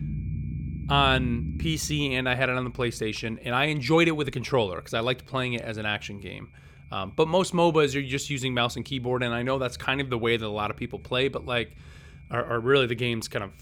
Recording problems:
high-pitched whine; faint; throughout; 2.5 kHz, 35 dB below the speech
low rumble; faint; throughout; 25 dB below the speech

